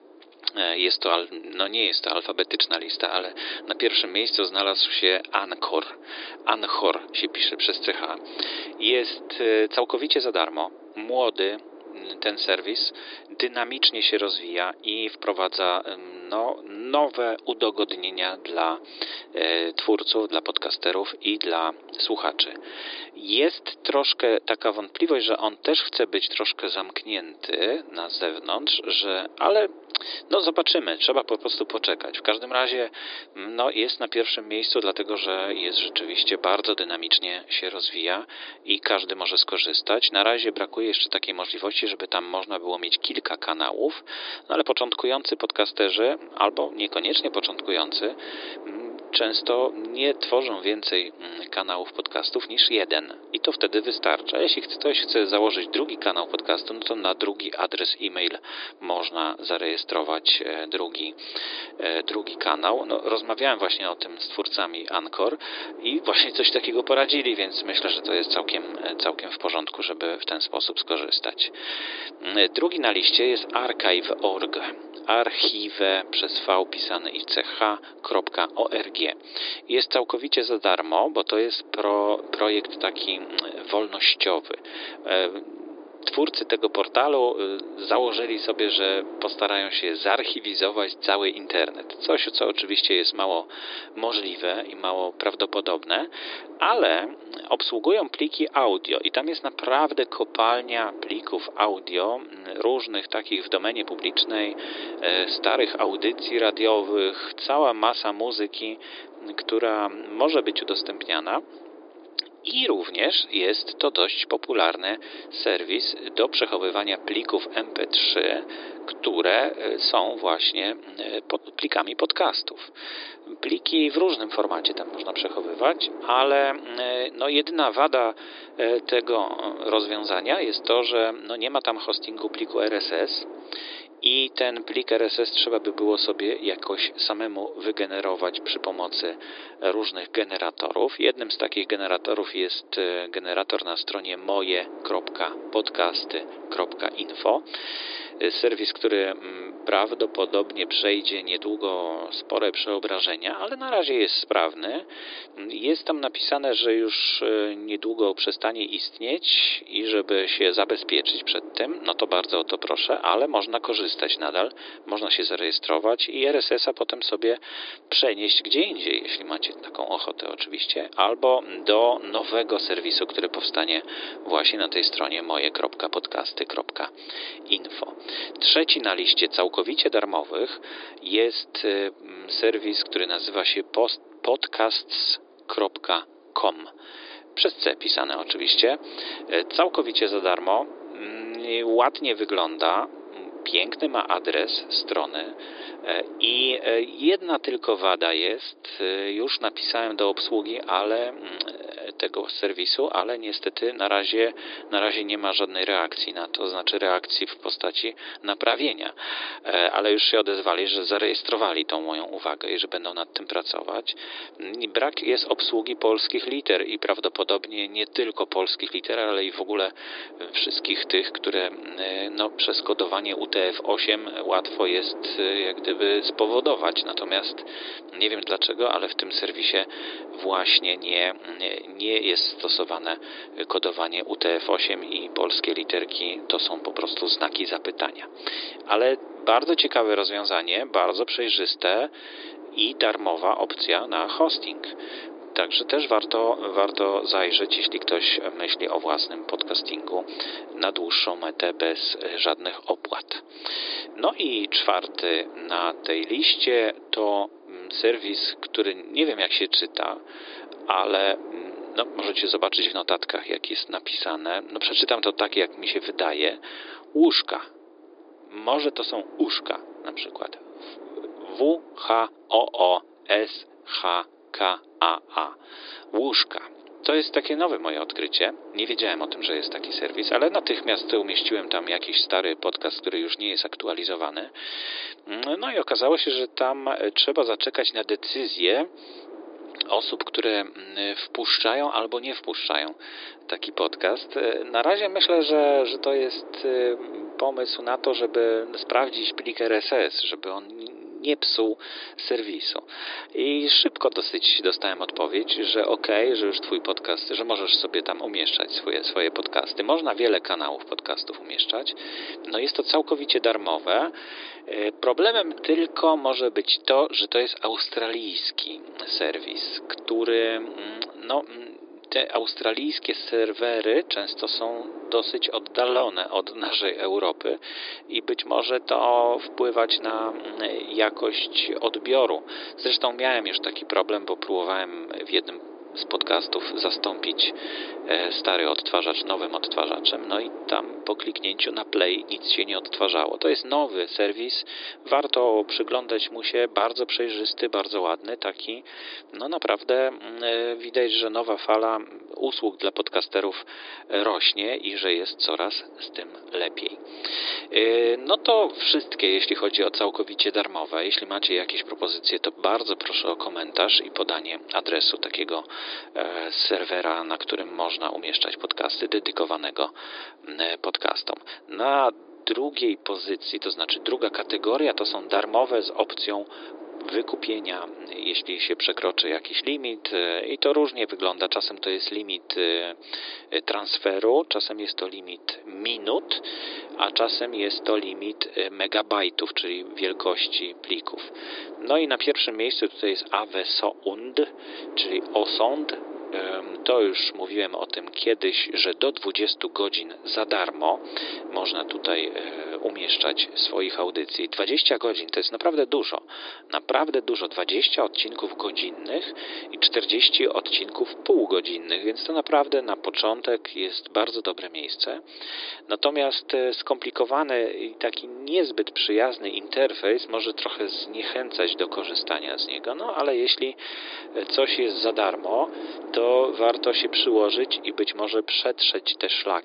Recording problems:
thin; very; fading below 300 Hz
high frequencies cut off; severe; nothing above 5 kHz
wind noise on the microphone; occasional gusts; 20 dB below the speech

